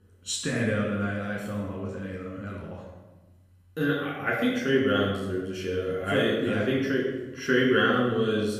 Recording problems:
off-mic speech; far
room echo; noticeable; dies away in 0.9 s

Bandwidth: 15 kHz